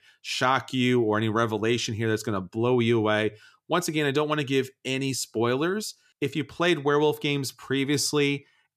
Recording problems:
none

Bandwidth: 14.5 kHz